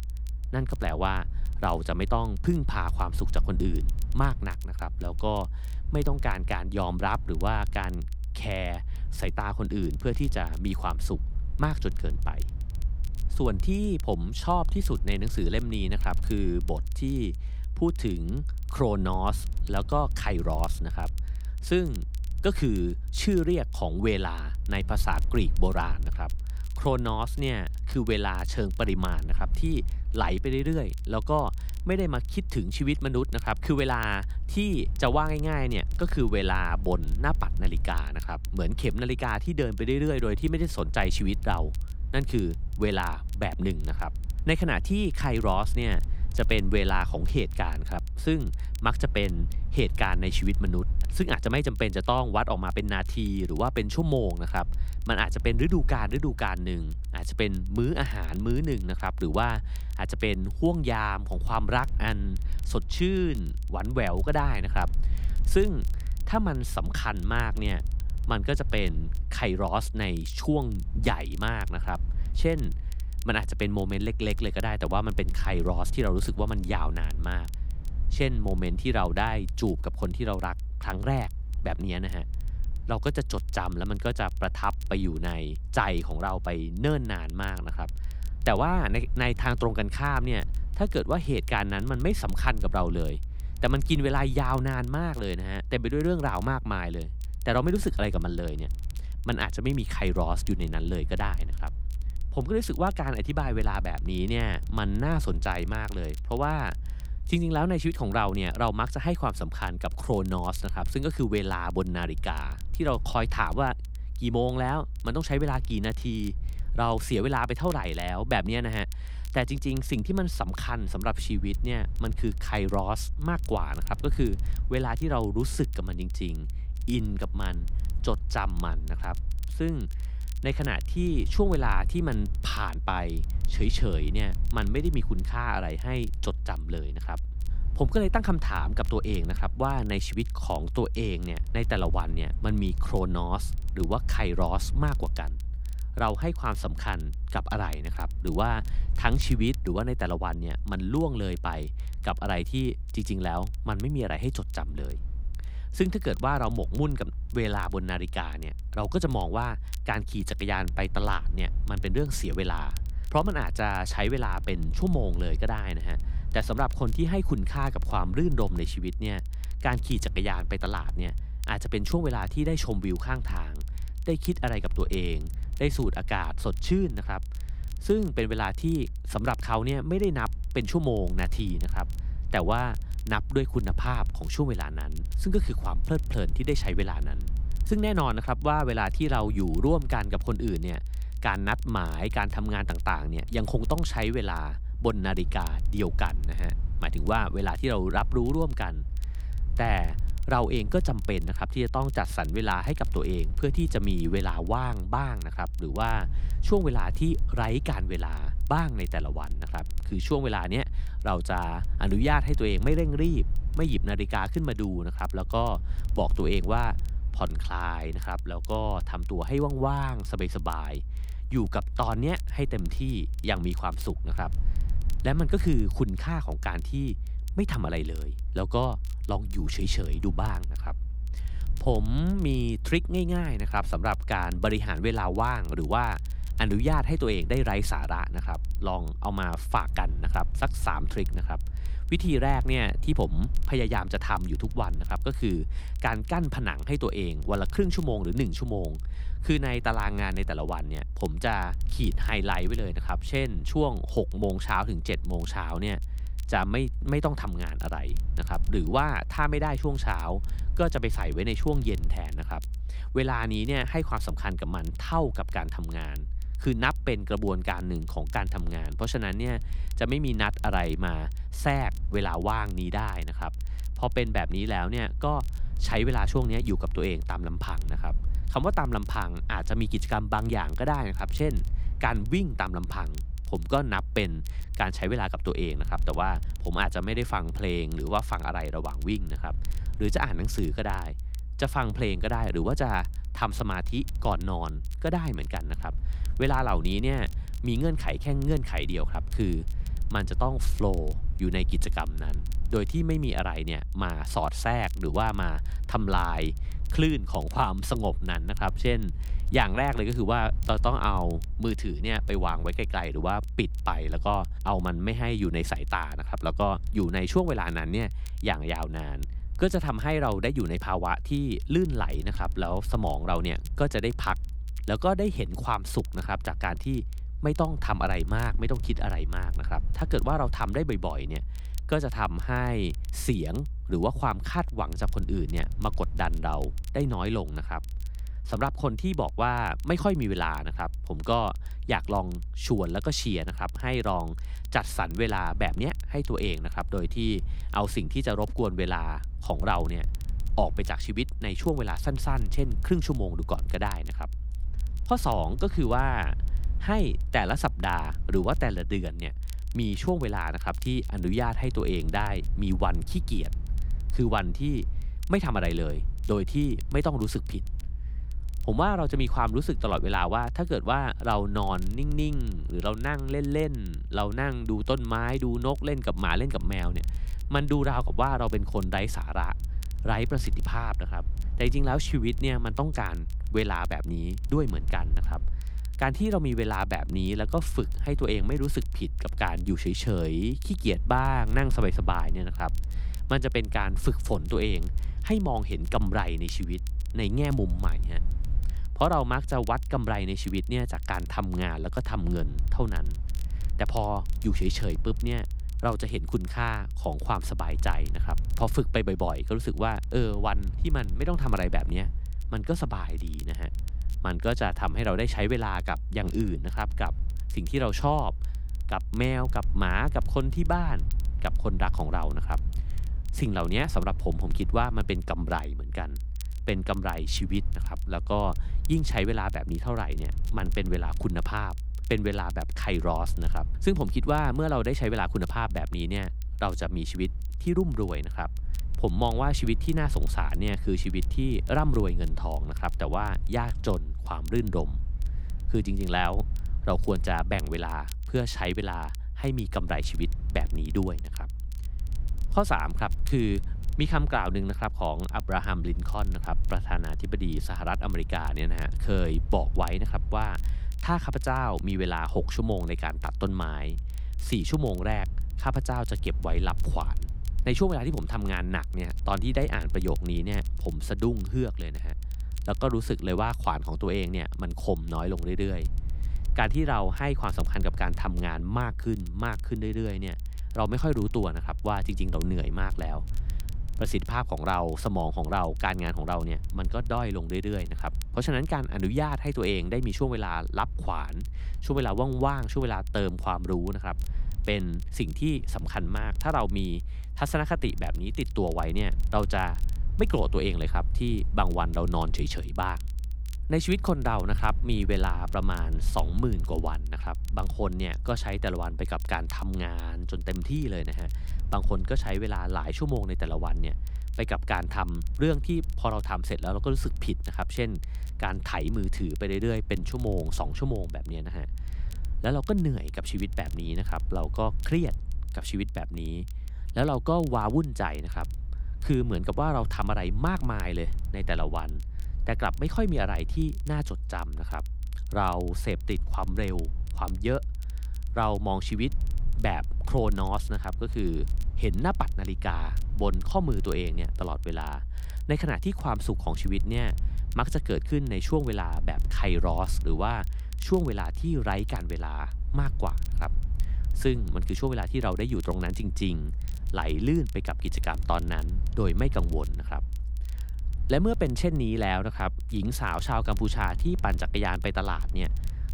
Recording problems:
low rumble; faint; throughout; 25 dB below the speech
crackle, like an old record; faint; 25 dB below the speech

